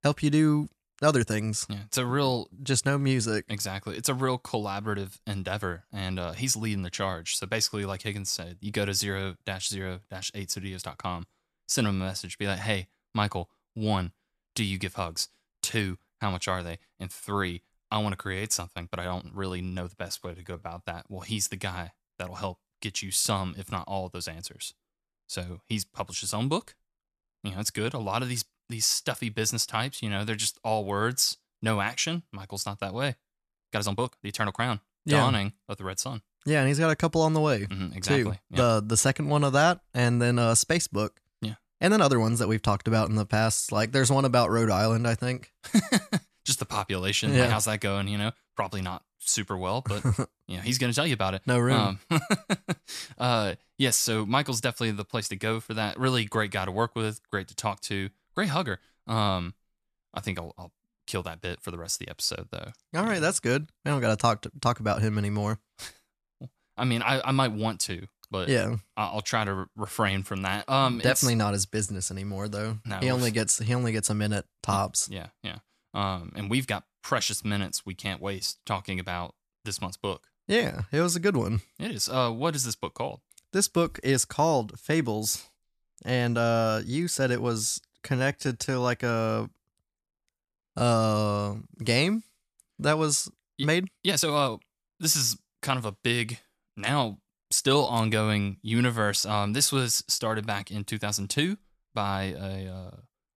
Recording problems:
uneven, jittery; strongly; from 1 s to 1:38

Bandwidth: 14 kHz